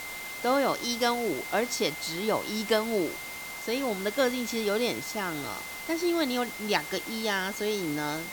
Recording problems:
high-pitched whine; loud; throughout; 2 kHz, 10 dB below the speech
hiss; loud; throughout; 10 dB below the speech

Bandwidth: 18.5 kHz